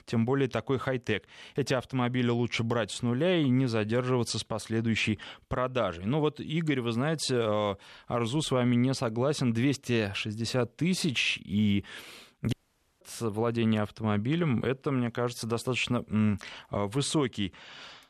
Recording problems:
audio cutting out; at 13 s

